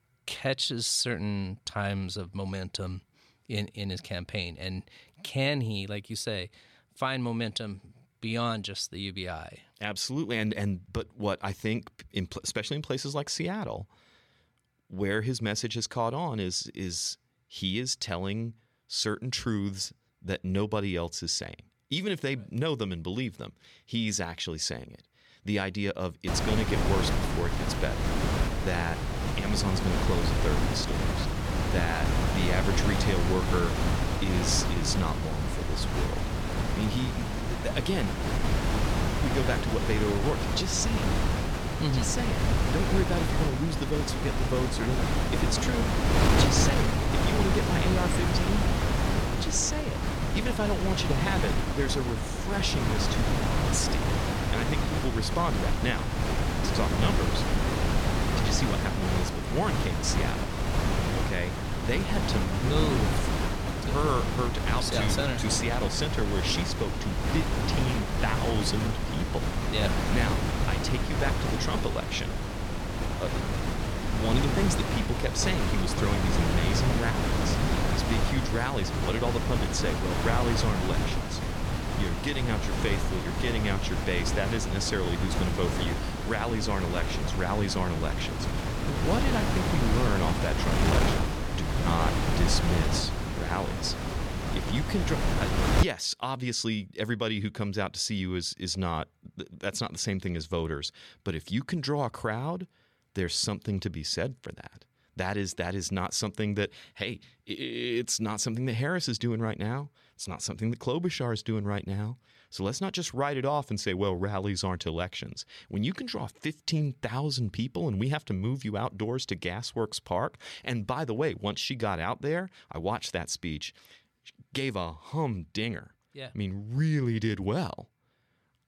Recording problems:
wind noise on the microphone; heavy; from 26 s to 1:36; 1 dB above the speech

